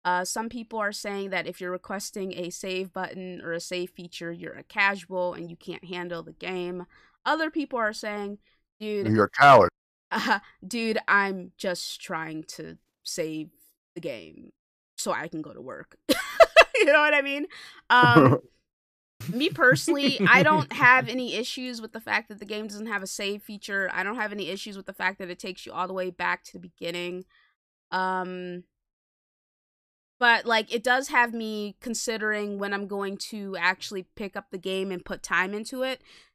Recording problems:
none

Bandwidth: 14.5 kHz